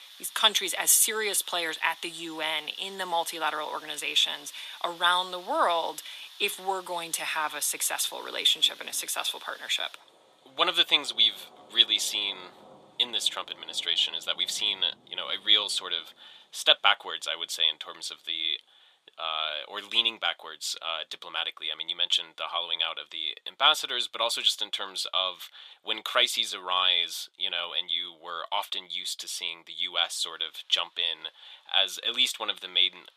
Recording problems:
thin; very; fading below 850 Hz
rain or running water; faint; throughout; 20 dB below the speech

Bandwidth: 14.5 kHz